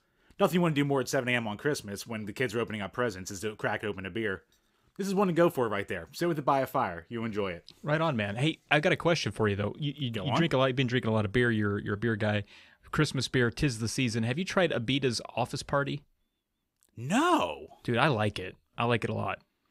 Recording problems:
none

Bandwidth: 15.5 kHz